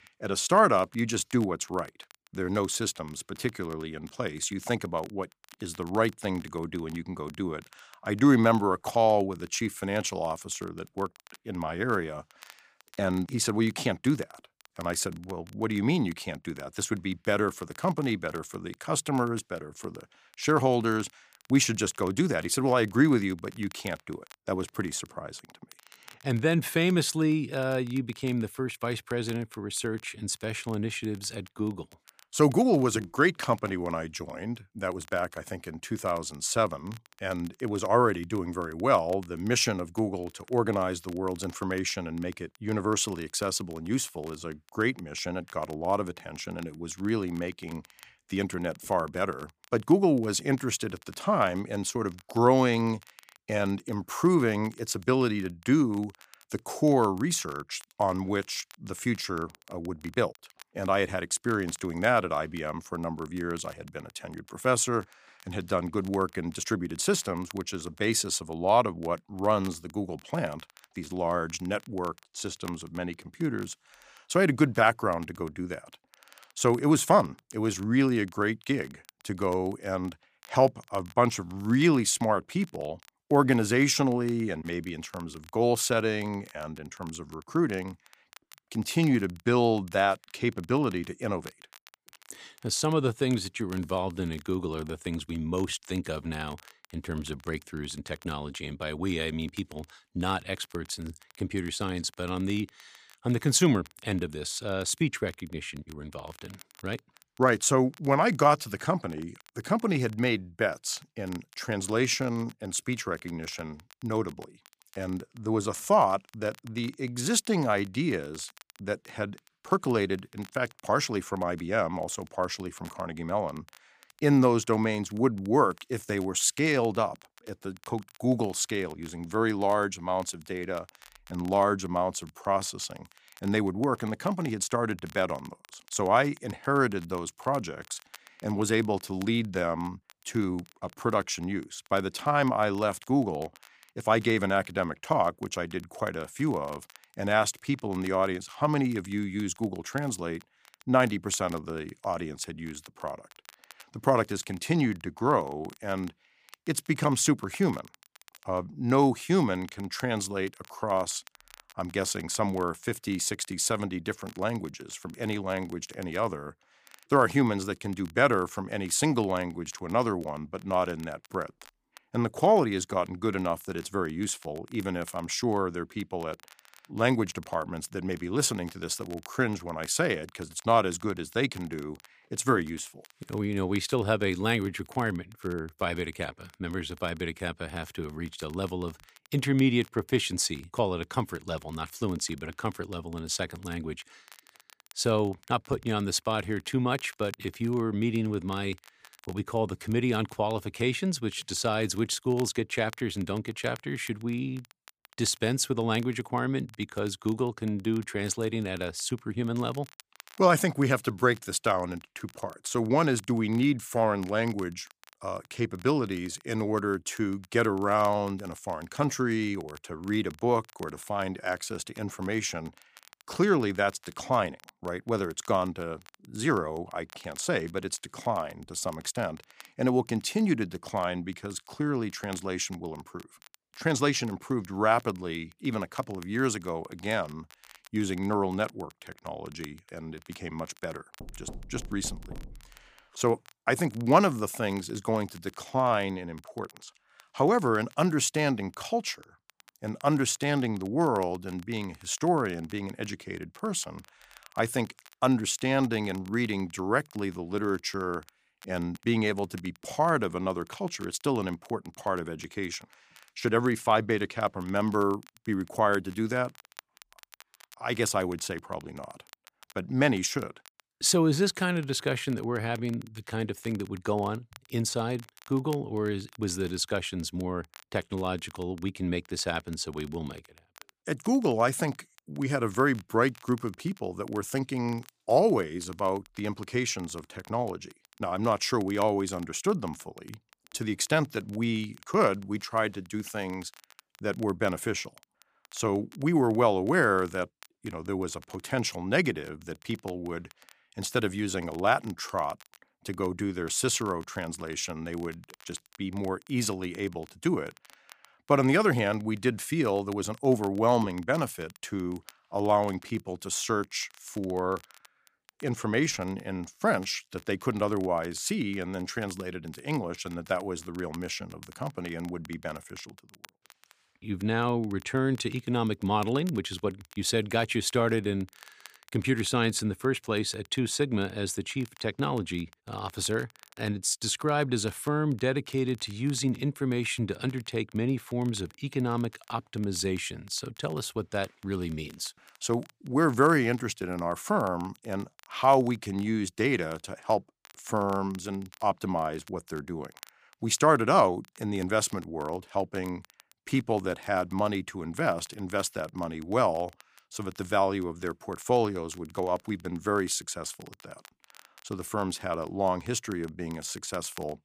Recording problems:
crackle, like an old record; faint; 25 dB below the speech
door banging; faint; from 4:01 to 4:03; peak 15 dB below the speech

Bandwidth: 15 kHz